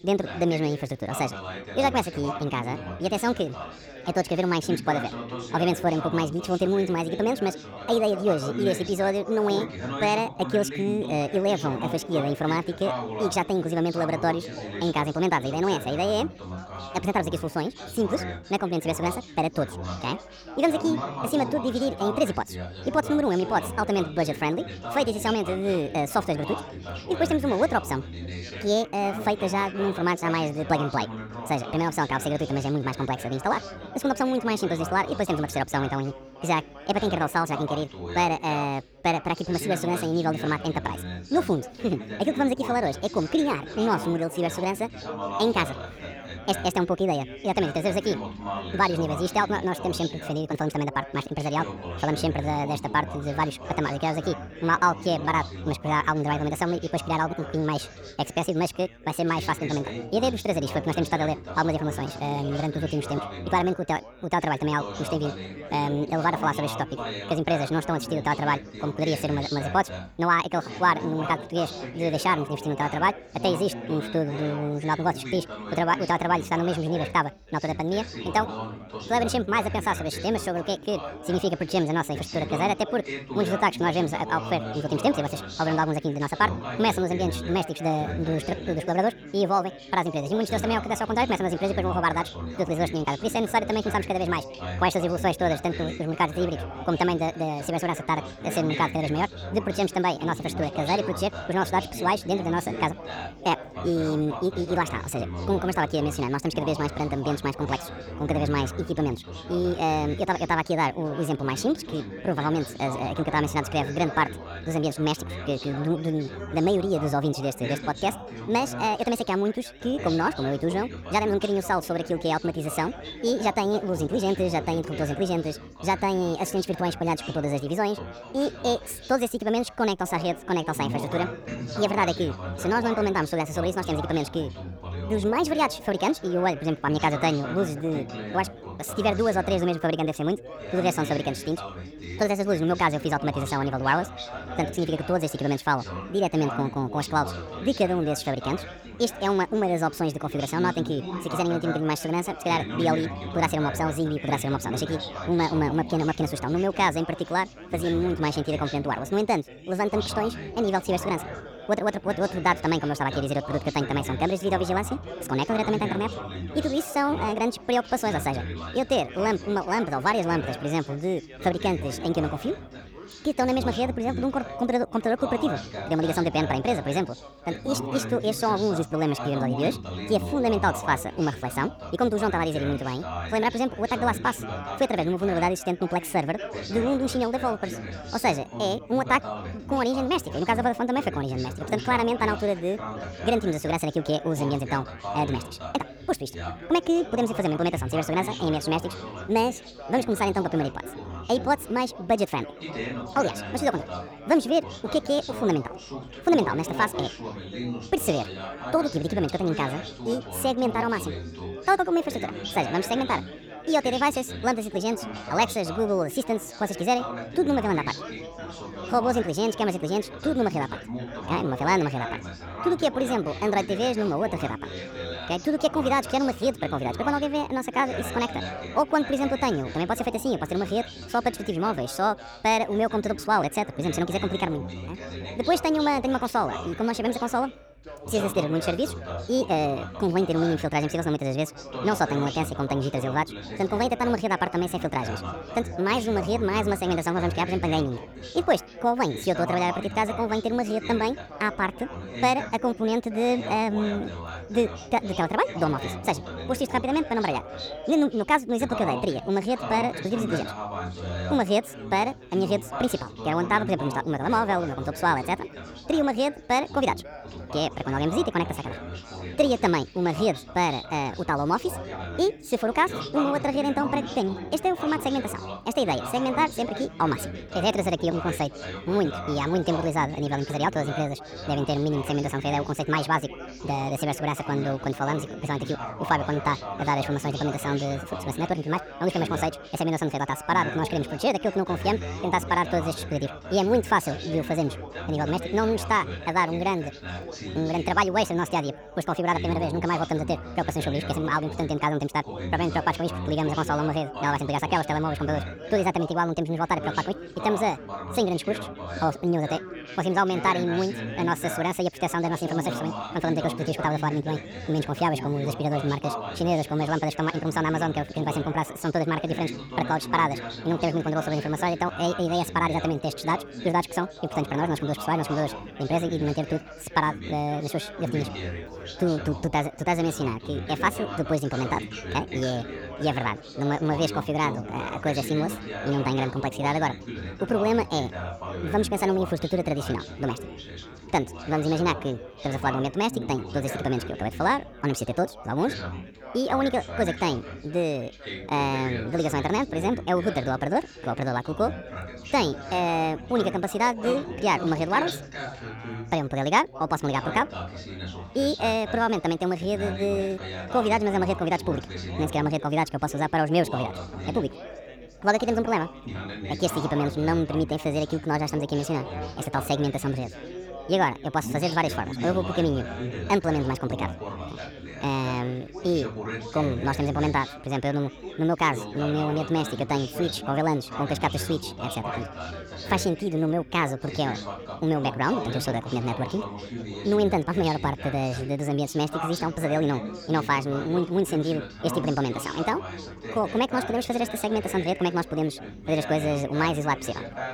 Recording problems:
wrong speed and pitch; too fast and too high; 1.6 times normal speed
background chatter; loud; throughout; 4 voices, 10 dB below the speech

